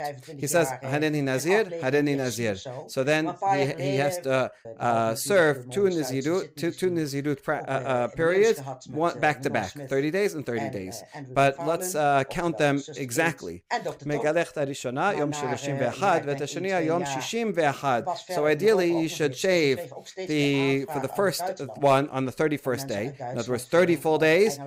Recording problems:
voice in the background; noticeable; throughout; 10 dB below the speech

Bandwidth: 15.5 kHz